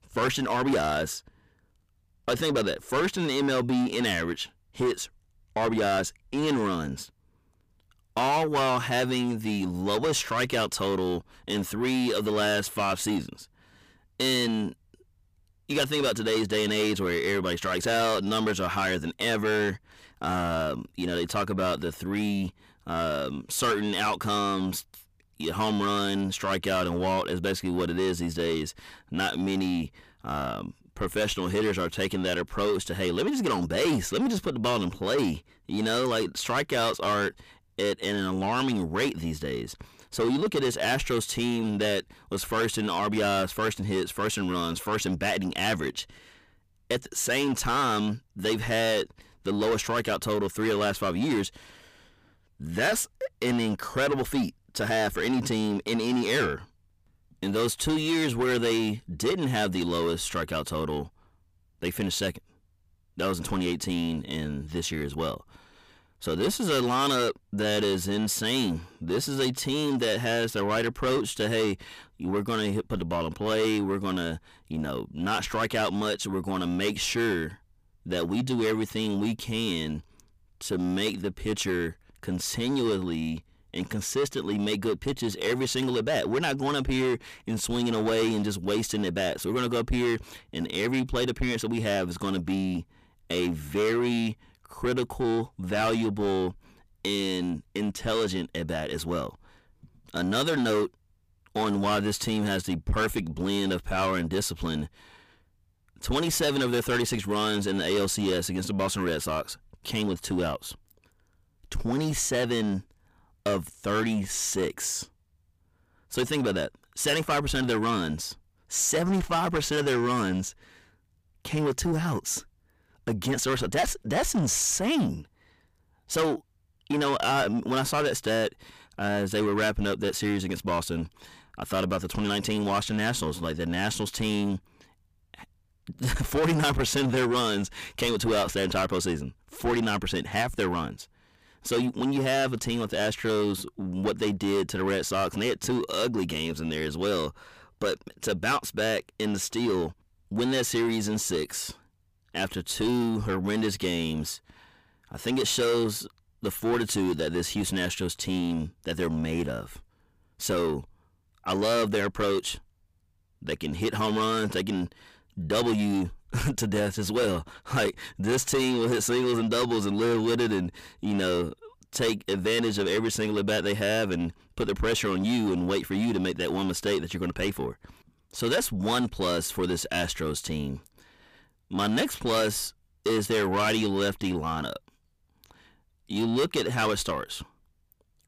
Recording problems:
distortion; heavy; 7 dB below the speech

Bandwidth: 15 kHz